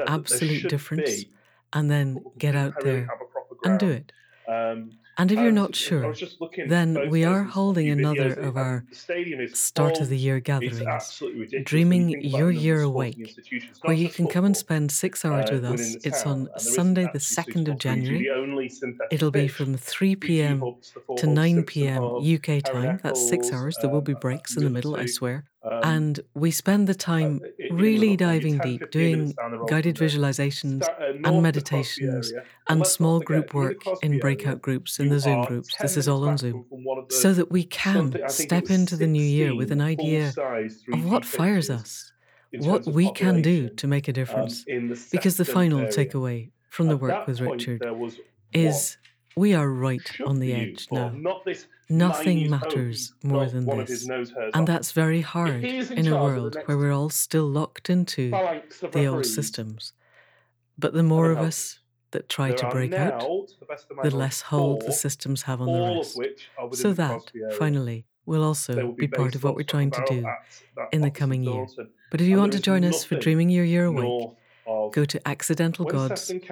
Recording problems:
voice in the background; loud; throughout; 7 dB below the speech

